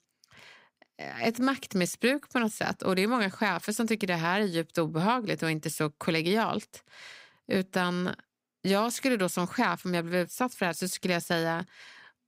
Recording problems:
none

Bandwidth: 15.5 kHz